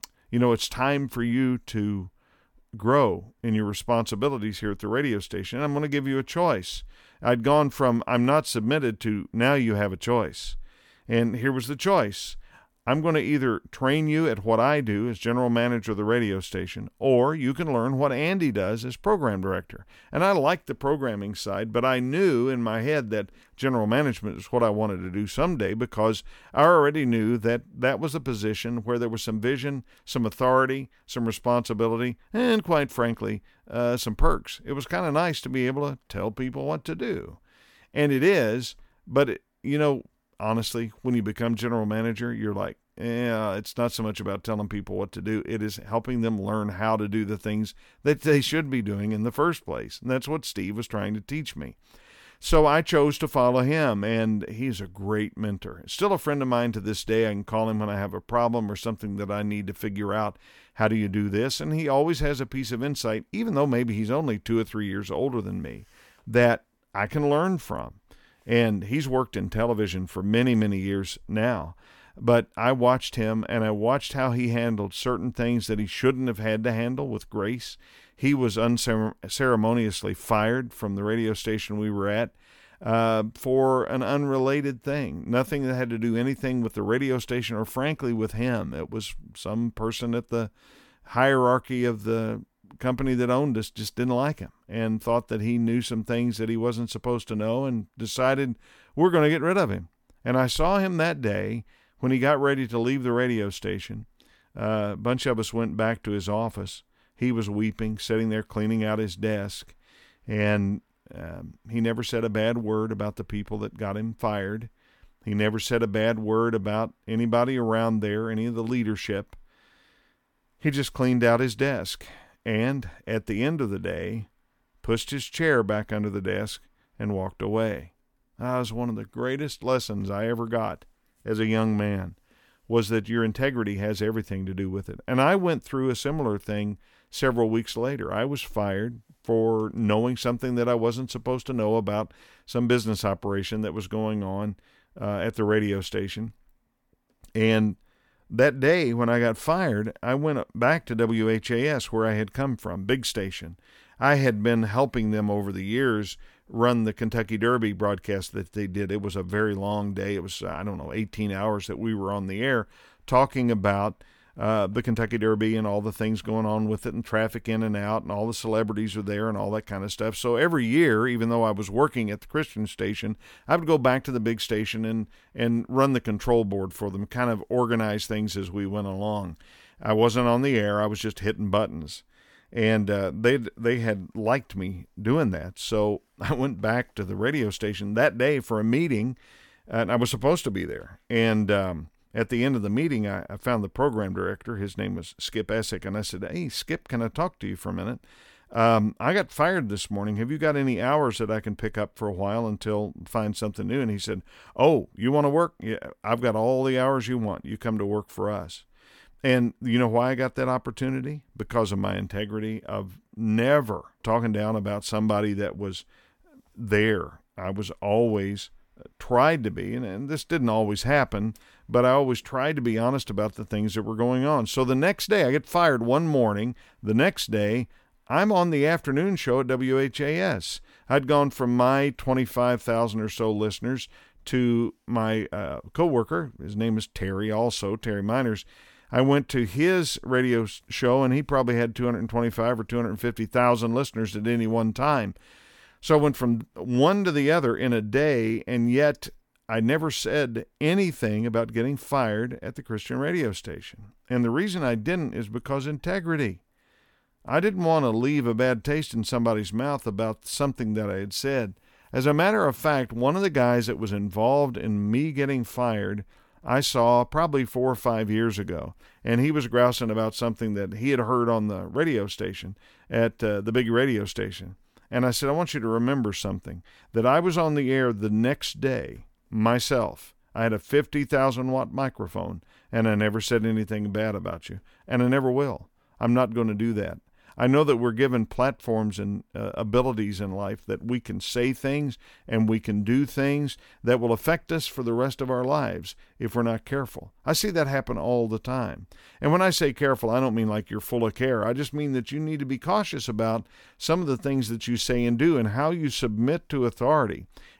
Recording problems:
none

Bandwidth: 18 kHz